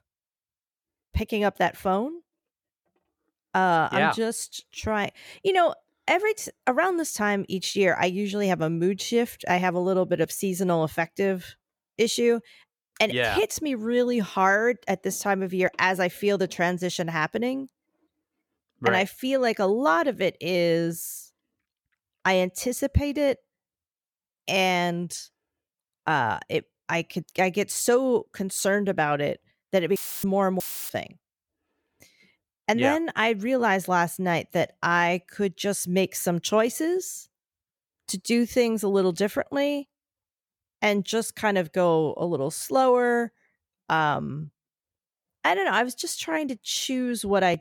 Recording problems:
audio cutting out; filled with static; at 30 s and at 31 s

